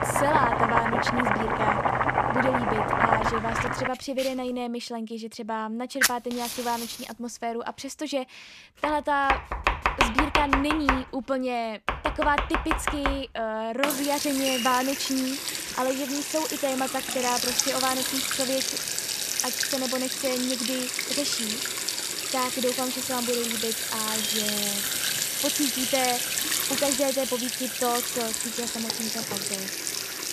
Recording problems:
household noises; very loud; throughout; 3 dB above the speech

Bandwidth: 14.5 kHz